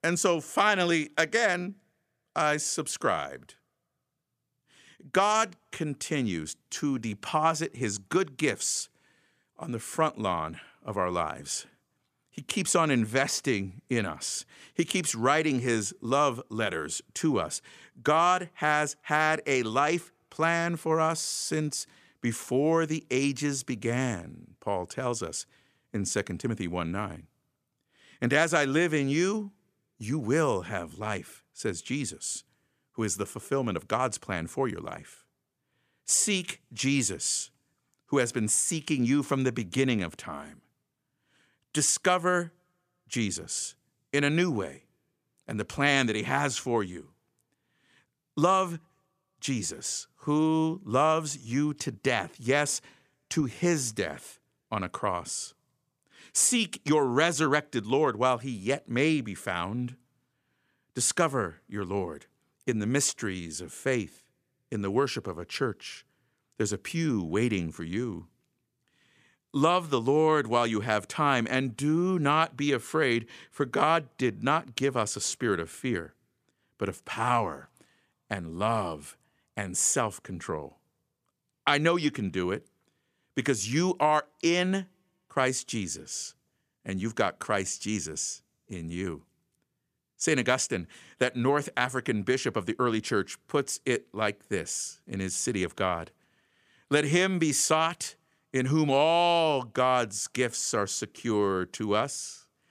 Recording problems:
none

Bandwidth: 14.5 kHz